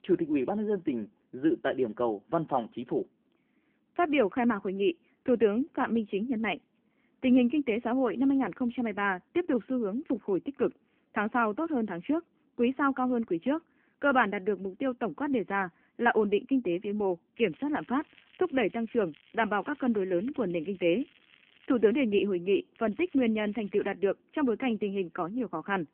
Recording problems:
phone-call audio; nothing above 3 kHz
crackling; faint; from 17 to 22 s and from 23 to 24 s; 30 dB below the speech

